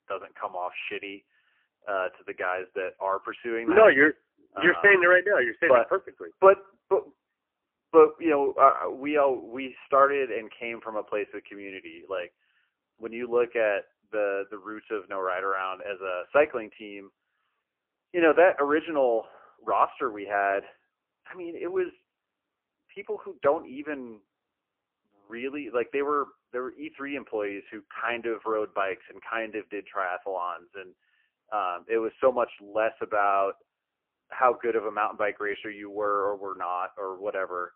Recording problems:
phone-call audio; poor line; nothing above 3 kHz

